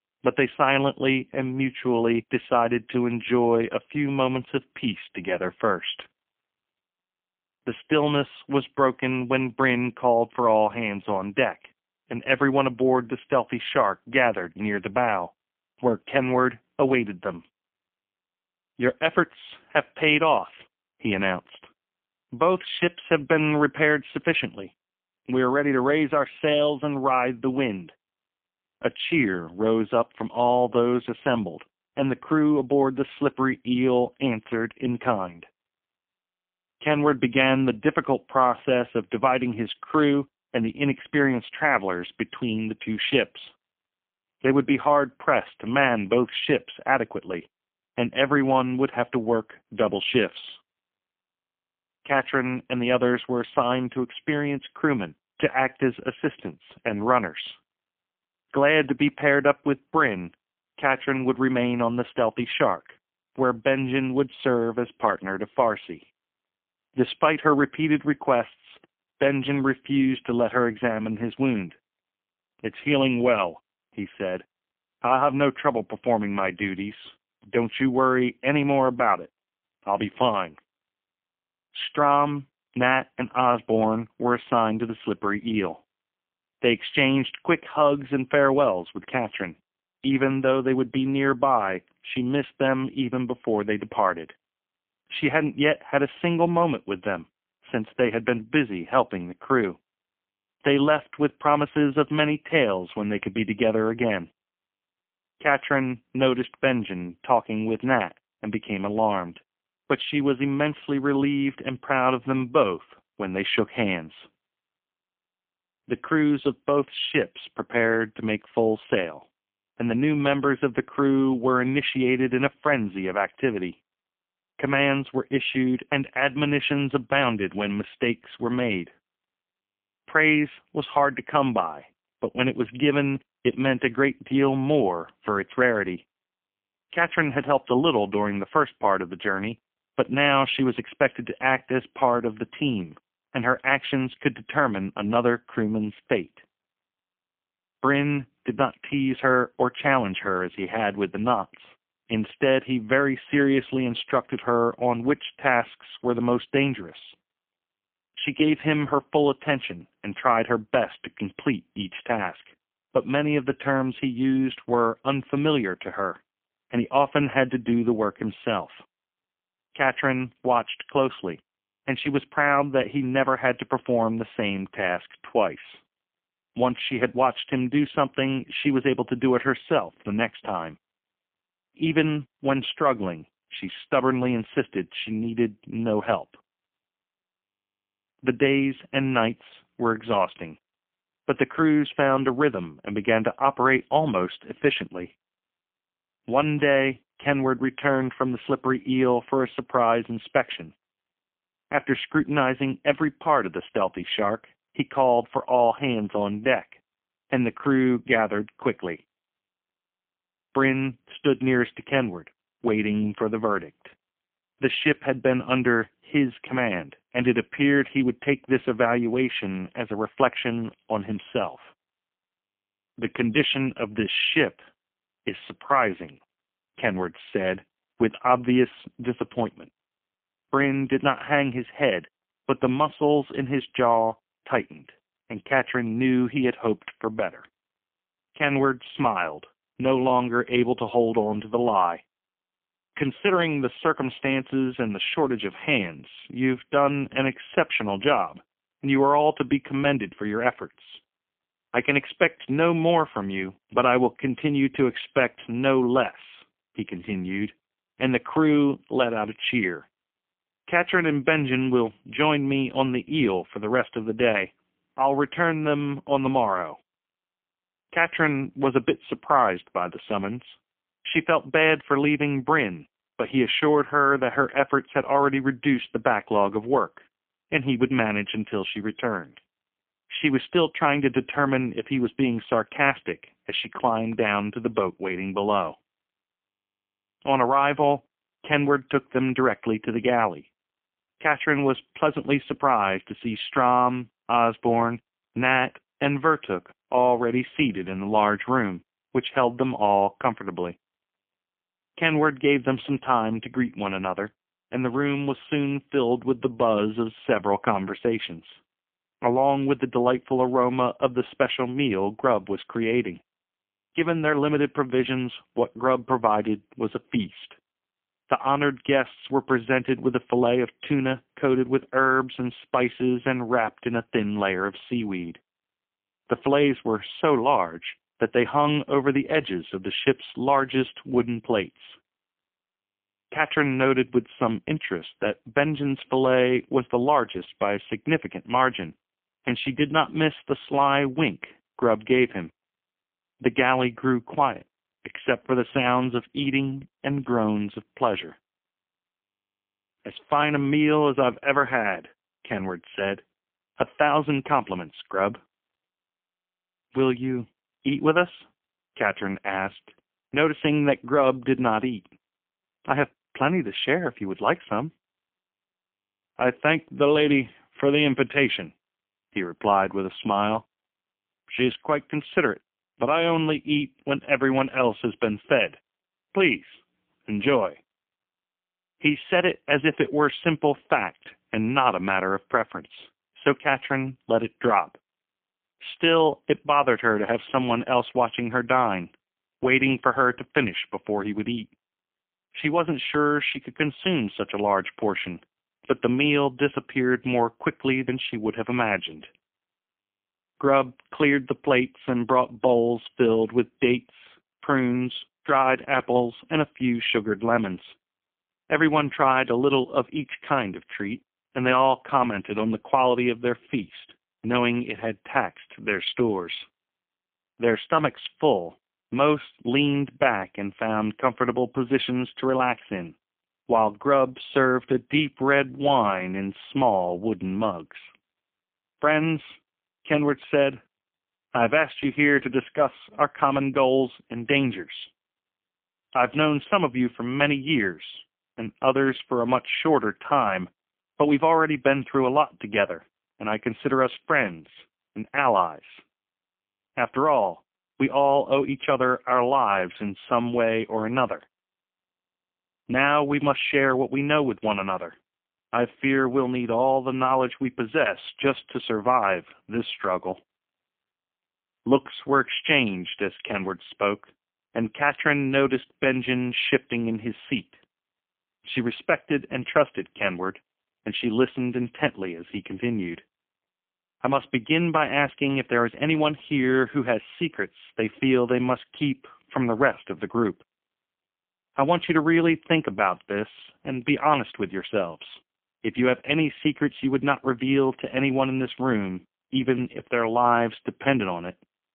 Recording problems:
phone-call audio; poor line; nothing above 3.5 kHz

